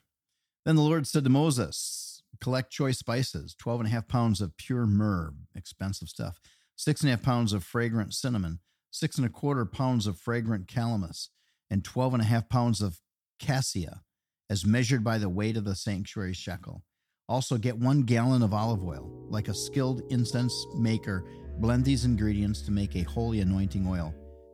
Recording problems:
background music; noticeable; from 18 s on; 15 dB below the speech

